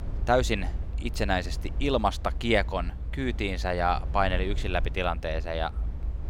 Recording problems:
low rumble; faint; throughout; 20 dB below the speech

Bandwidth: 16.5 kHz